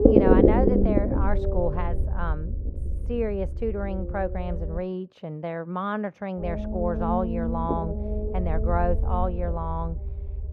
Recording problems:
muffled; very; fading above 2 kHz
low rumble; very loud; until 5 s and from 6.5 s on; 1 dB above the speech

